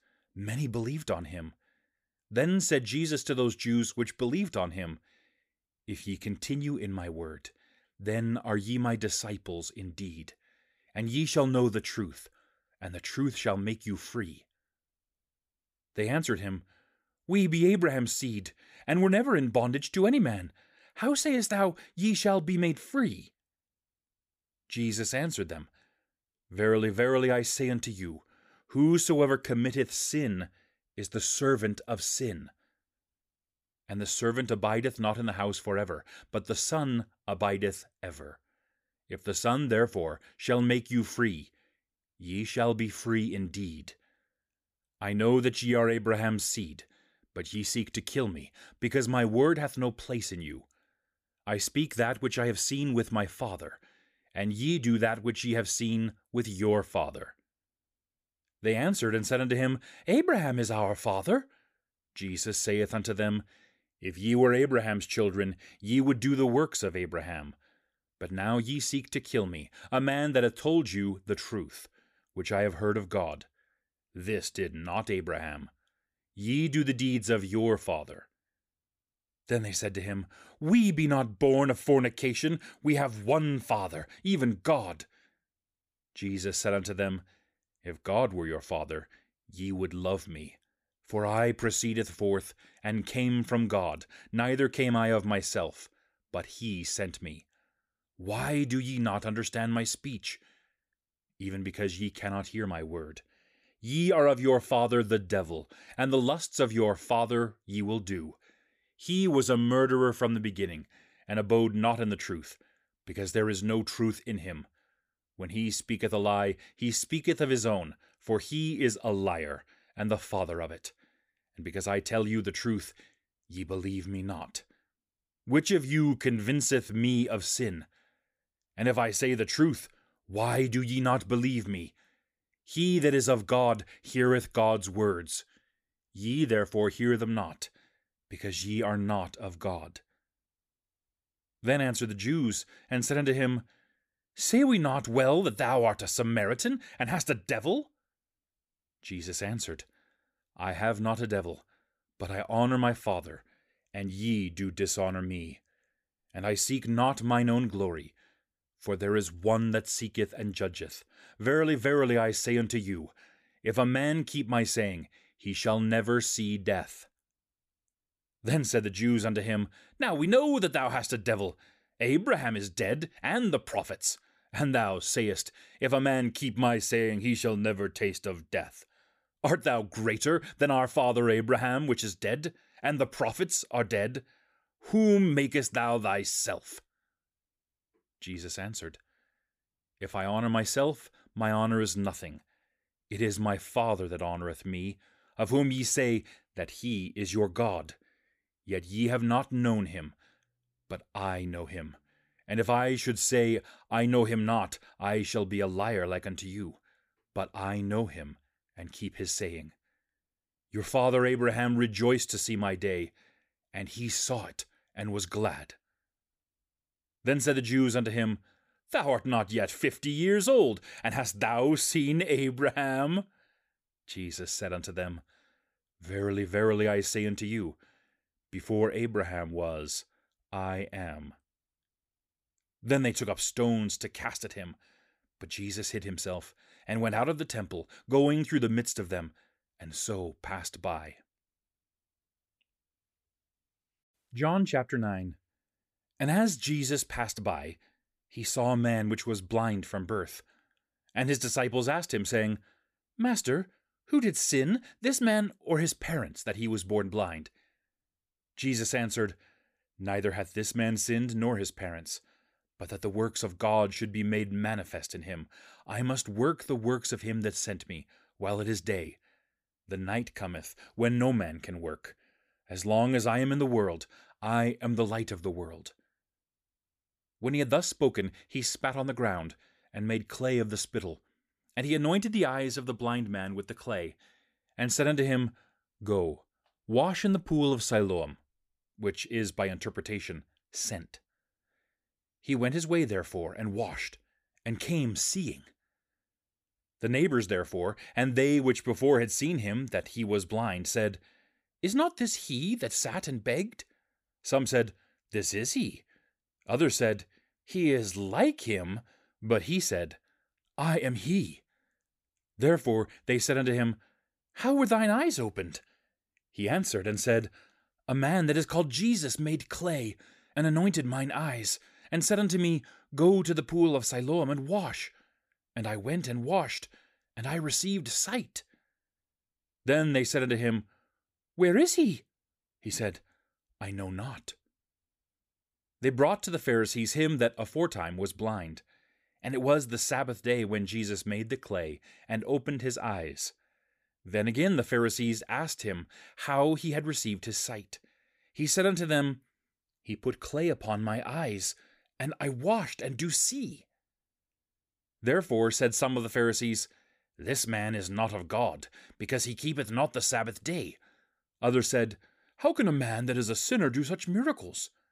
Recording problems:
none

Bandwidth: 15 kHz